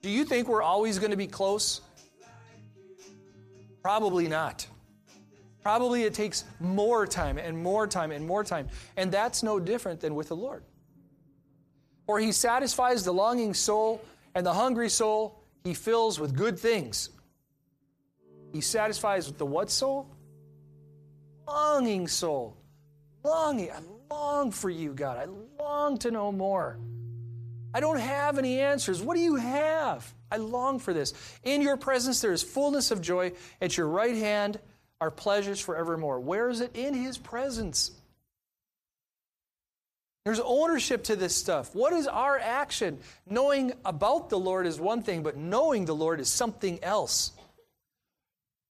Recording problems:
background music; faint; until 35 s; 25 dB below the speech

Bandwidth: 14 kHz